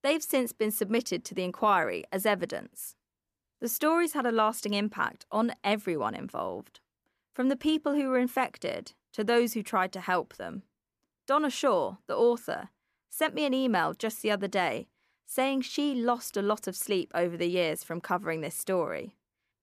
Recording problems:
none

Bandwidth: 14.5 kHz